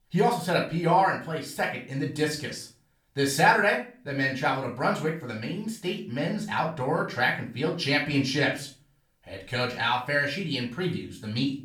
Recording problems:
off-mic speech; far
room echo; slight; dies away in 0.4 s

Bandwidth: 18.5 kHz